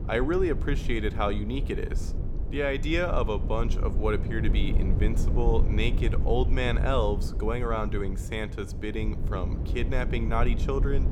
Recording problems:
low rumble; noticeable; throughout; 10 dB below the speech

